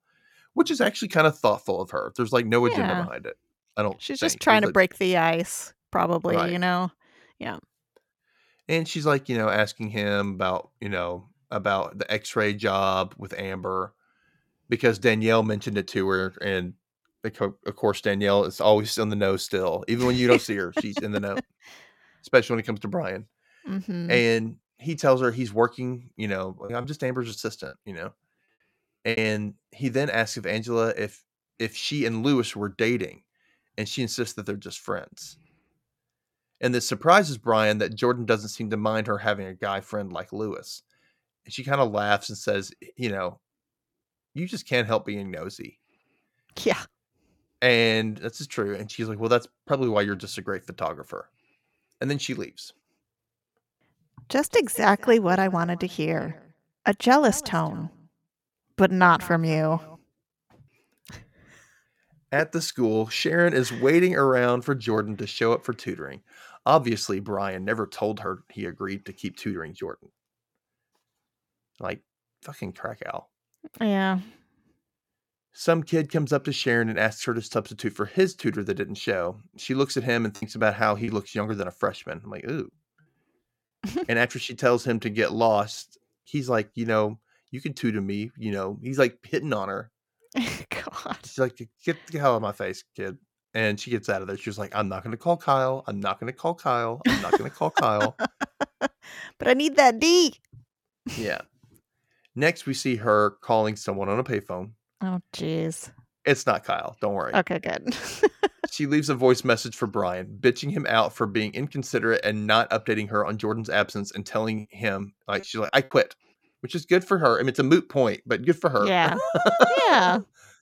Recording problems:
choppy; very; from 27 to 29 s, from 1:20 to 1:22 and at 1:55; 9% of the speech affected

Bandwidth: 17 kHz